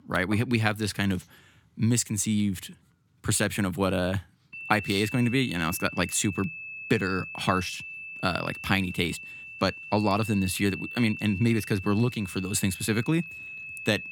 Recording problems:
high-pitched whine; noticeable; from 4.5 s on; 2.5 kHz, 10 dB below the speech

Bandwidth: 18 kHz